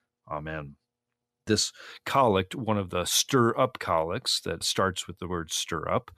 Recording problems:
none

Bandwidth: 14.5 kHz